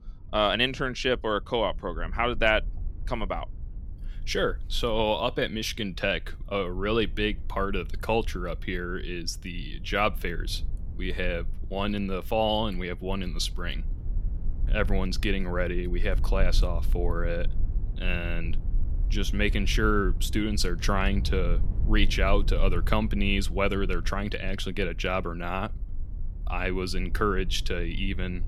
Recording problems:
low rumble; faint; throughout; 25 dB below the speech

